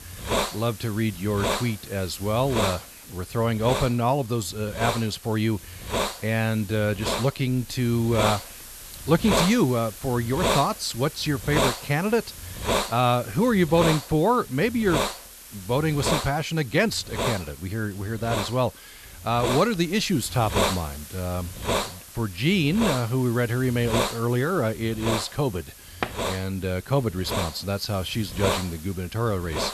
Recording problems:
hiss; loud; throughout; 5 dB below the speech
door banging; noticeable; at 26 s; peak 7 dB below the speech

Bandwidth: 13.5 kHz